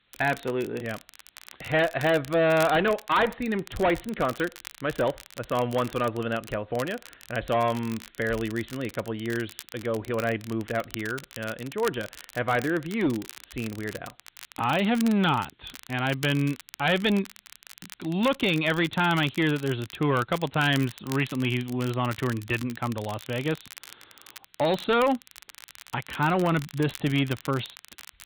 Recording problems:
high frequencies cut off; severe; nothing above 4 kHz
distortion; slight; 5% of the sound clipped
crackle, like an old record; noticeable; 20 dB below the speech
hiss; very faint; throughout; 40 dB below the speech

